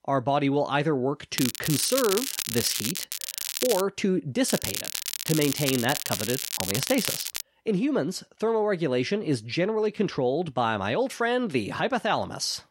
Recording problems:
crackling; loud; from 1.5 to 4 s and from 4.5 to 7.5 s; 3 dB below the speech

